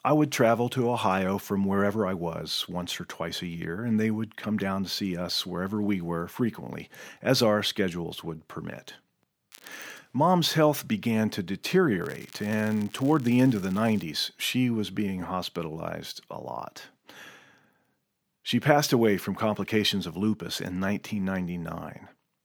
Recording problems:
crackling; faint; at 9.5 s and from 12 to 14 s; 25 dB below the speech

